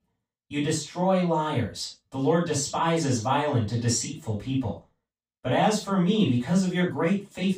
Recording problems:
off-mic speech; far
room echo; noticeable; dies away in 0.2 s

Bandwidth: 15.5 kHz